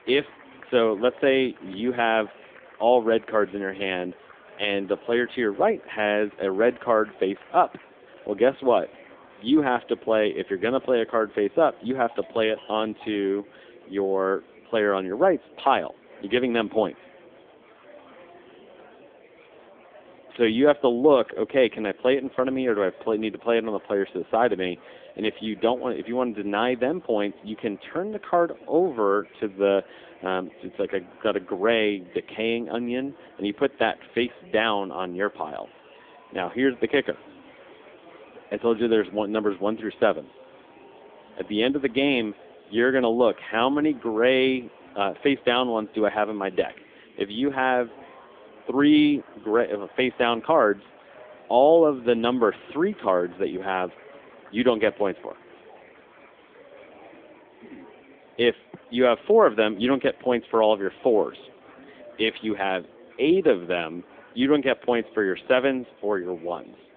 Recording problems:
phone-call audio; nothing above 3.5 kHz
murmuring crowd; faint; throughout; 25 dB below the speech

